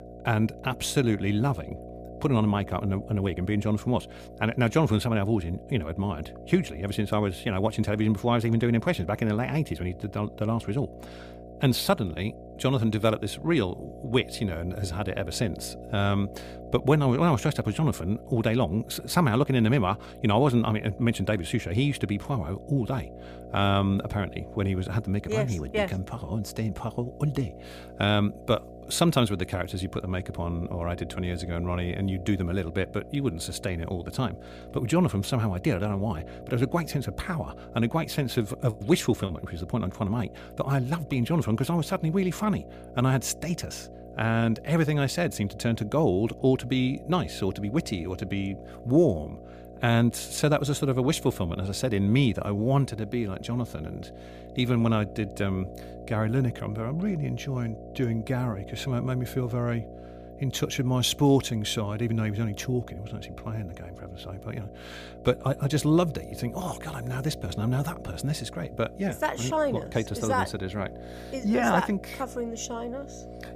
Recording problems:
electrical hum; noticeable; throughout; 60 Hz, 15 dB below the speech

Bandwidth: 15 kHz